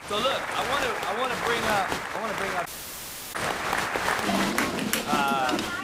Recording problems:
crowd noise; very loud; throughout; 1 dB above the speech
rain or running water; very faint; throughout; 30 dB below the speech
audio cutting out; at 2.5 s for 0.5 s

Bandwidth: 15.5 kHz